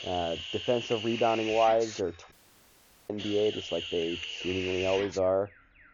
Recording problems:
high frequencies cut off; noticeable; nothing above 7 kHz
muffled; very slightly; fading above 2 kHz
hiss; loud; until 2 s and from 3 to 5 s; 7 dB below the speech
alarms or sirens; faint; throughout; 25 dB below the speech
audio cutting out; at 2.5 s for 1 s

